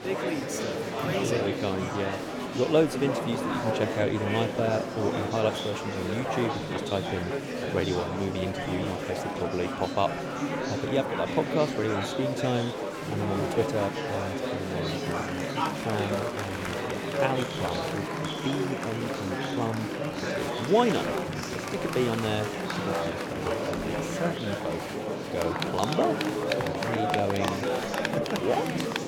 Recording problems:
murmuring crowd; very loud; throughout; as loud as the speech

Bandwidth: 17 kHz